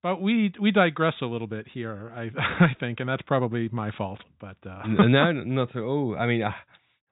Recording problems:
high frequencies cut off; severe; nothing above 4 kHz

